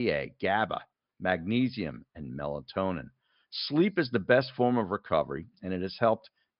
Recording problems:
high frequencies cut off; noticeable; nothing above 5.5 kHz
abrupt cut into speech; at the start

